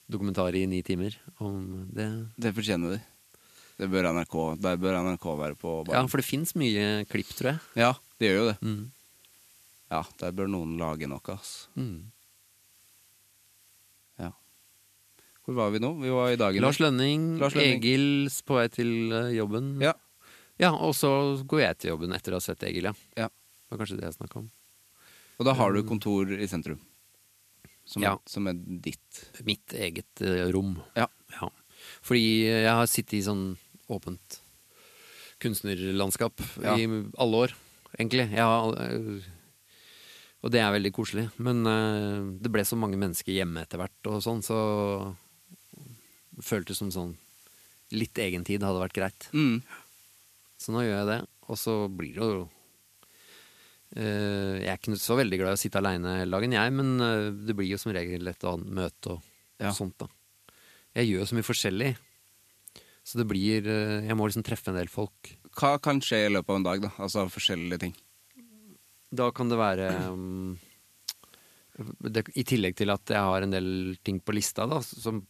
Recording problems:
hiss; faint; throughout; 30 dB below the speech

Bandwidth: 14 kHz